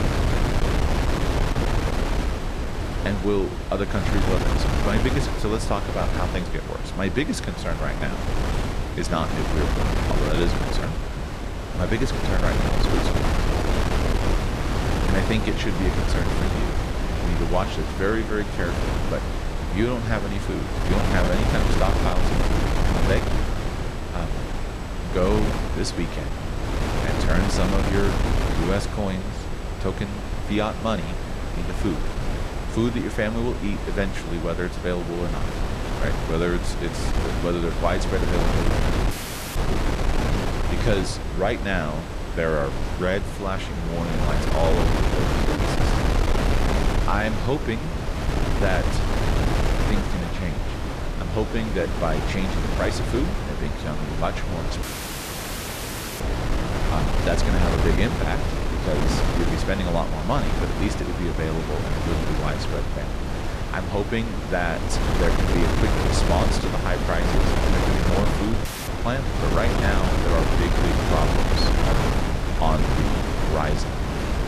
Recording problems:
wind noise on the microphone; heavy; as loud as the speech
high-pitched whine; faint; until 43 s; 8 kHz, 30 dB below the speech
audio cutting out; at 39 s, at 55 s for 1.5 s and at 1:09

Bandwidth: 14.5 kHz